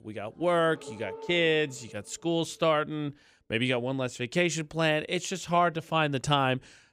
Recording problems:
animal sounds; noticeable; until 2 s; 20 dB below the speech

